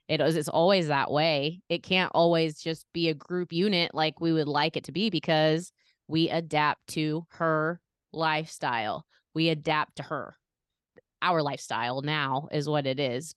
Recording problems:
uneven, jittery; strongly; from 1.5 to 12 s

